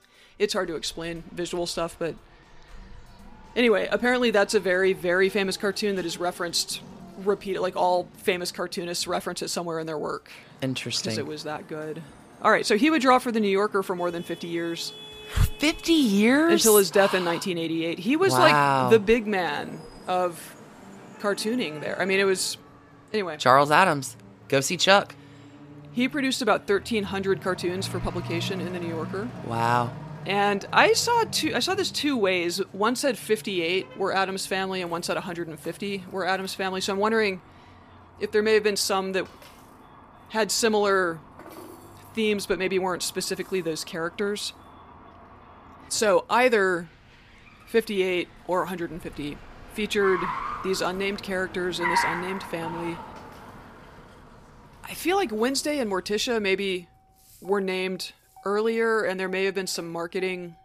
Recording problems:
traffic noise; noticeable; throughout; 15 dB below the speech
background music; faint; throughout; 30 dB below the speech

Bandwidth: 15 kHz